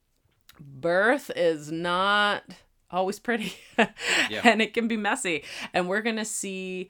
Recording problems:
none

